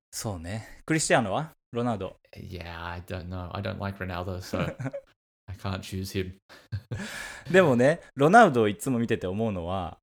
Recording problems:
none

